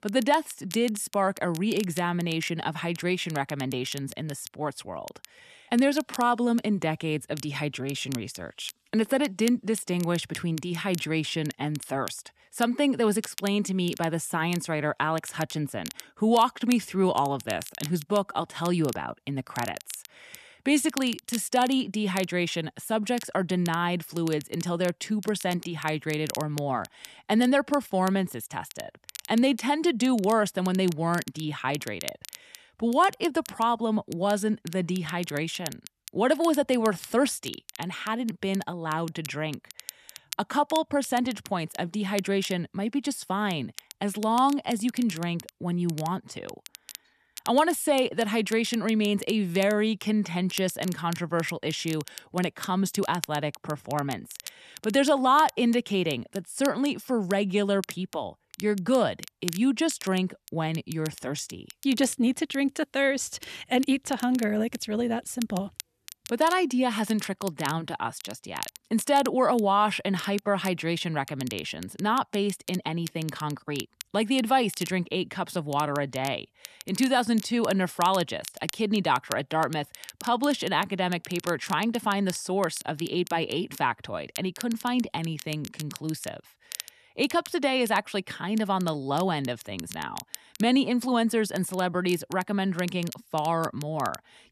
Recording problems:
crackle, like an old record; noticeable; 15 dB below the speech

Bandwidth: 13.5 kHz